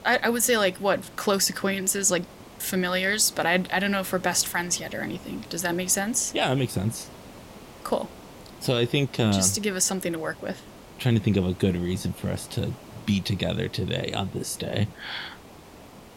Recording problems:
hiss; faint; throughout; 20 dB below the speech

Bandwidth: 16 kHz